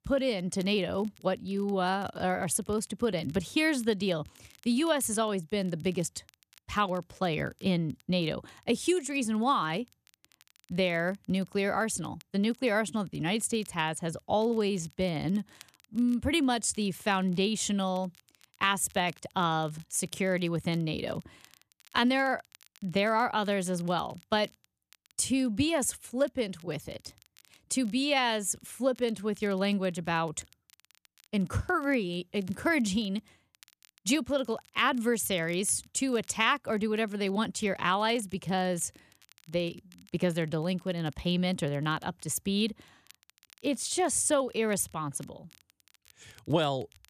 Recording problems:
crackle, like an old record; faint; 30 dB below the speech

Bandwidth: 14.5 kHz